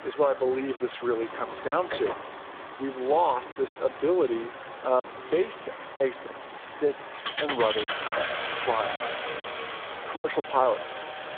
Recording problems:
phone-call audio; poor line; nothing above 3.5 kHz
traffic noise; loud; throughout; 7 dB below the speech
choppy; very; 6% of the speech affected

